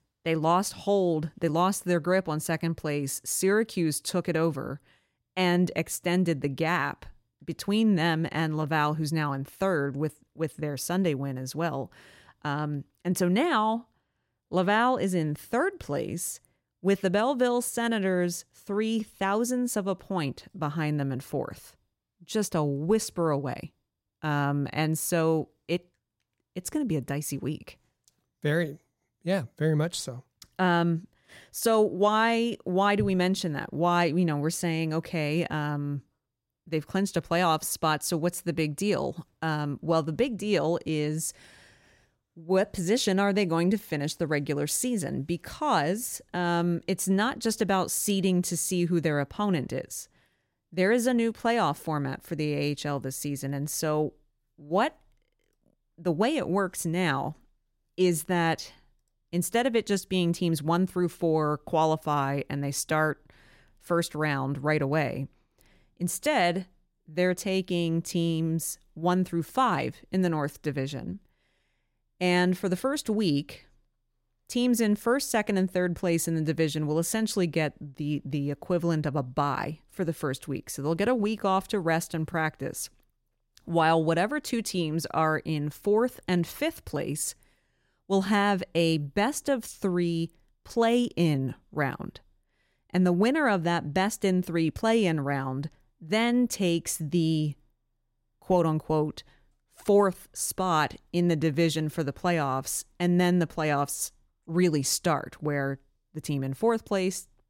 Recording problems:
none

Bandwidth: 16 kHz